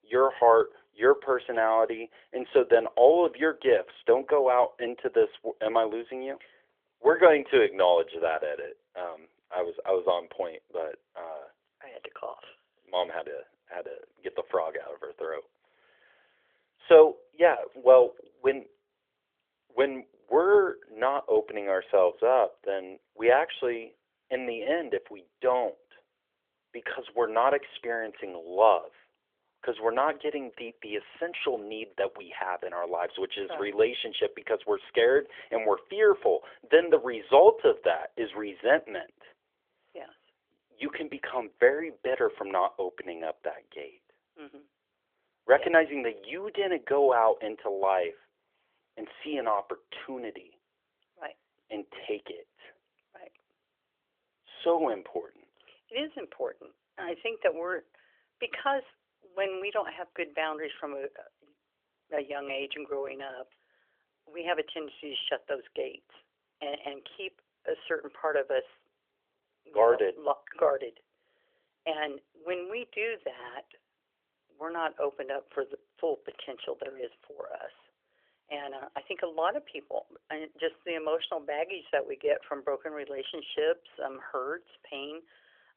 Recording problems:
phone-call audio; nothing above 3.5 kHz

